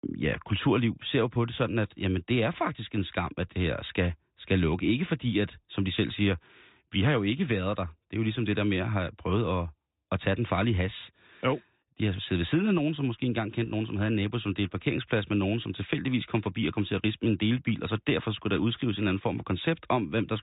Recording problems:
high frequencies cut off; severe; nothing above 4 kHz

